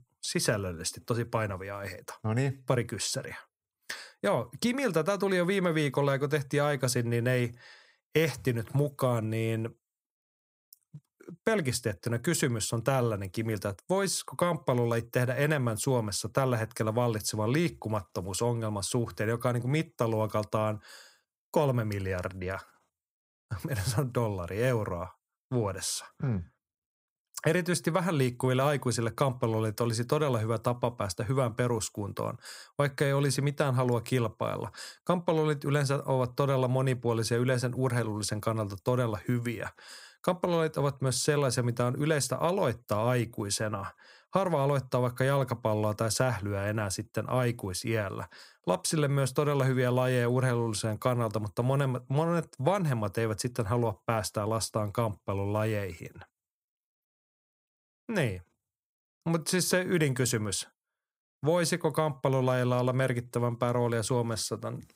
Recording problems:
none

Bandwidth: 15.5 kHz